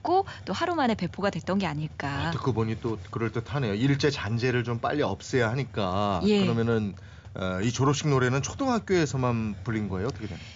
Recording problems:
high frequencies cut off; noticeable; nothing above 7.5 kHz
hiss; noticeable; throughout; 15 dB below the speech

